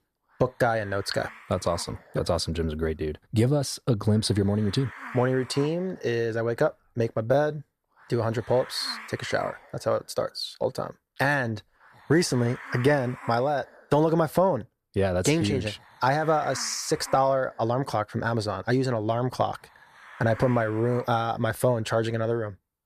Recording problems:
hiss; noticeable; throughout; 15 dB below the speech

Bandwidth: 14.5 kHz